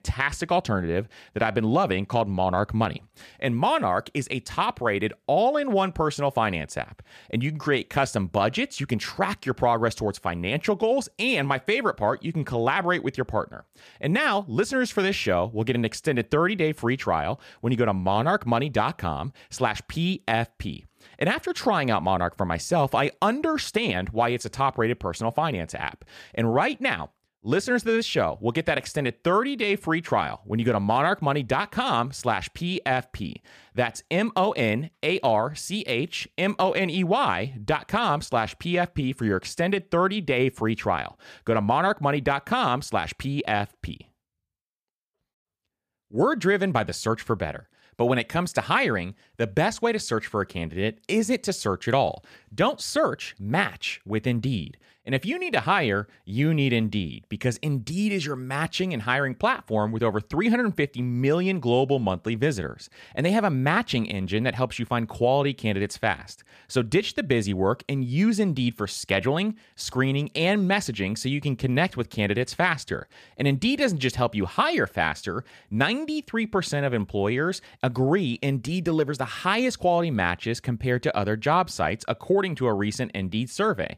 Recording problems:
none

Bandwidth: 14.5 kHz